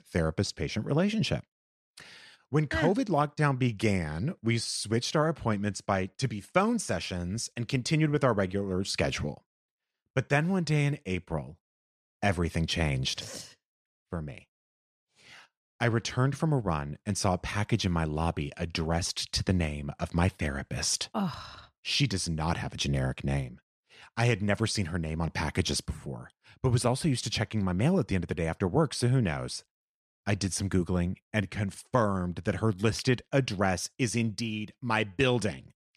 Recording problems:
none

